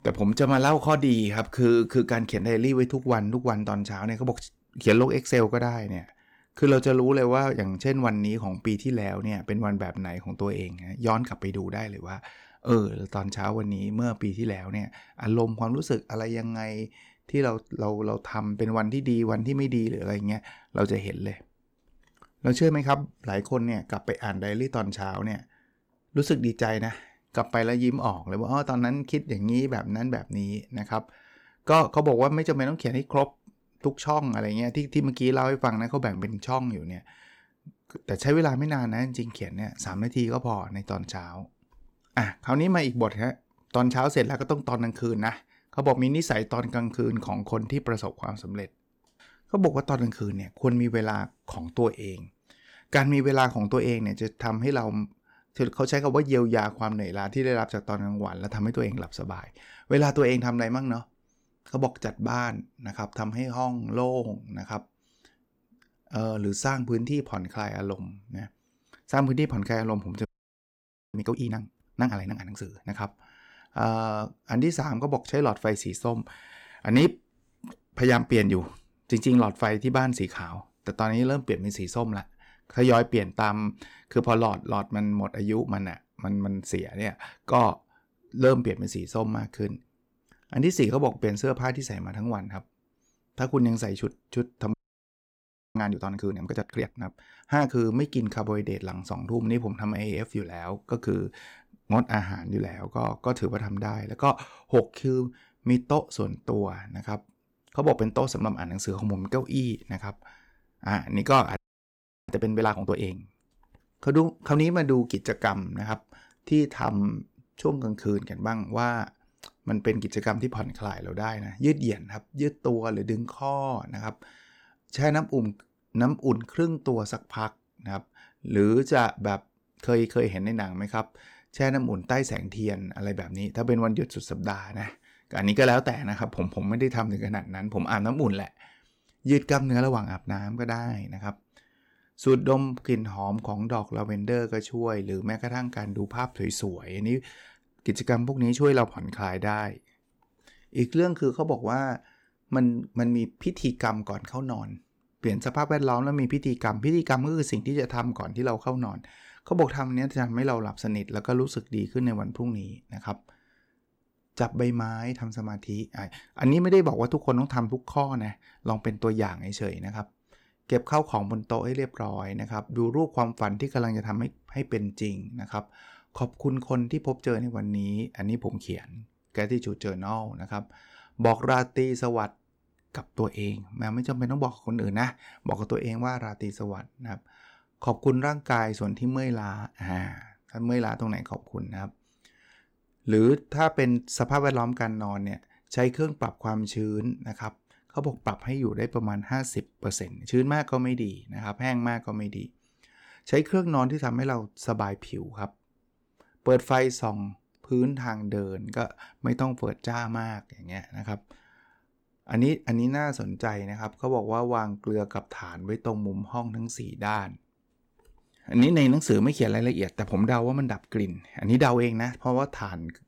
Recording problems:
audio freezing; at 1:10 for 1 s, at 1:35 for 1 s and at 1:52 for 0.5 s

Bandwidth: 17.5 kHz